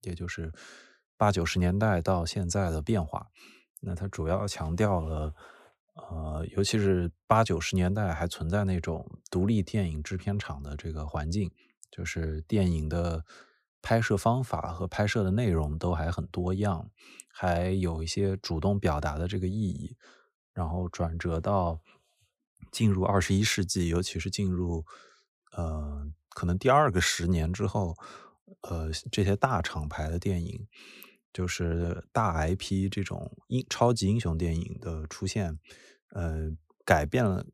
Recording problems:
none

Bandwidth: 15 kHz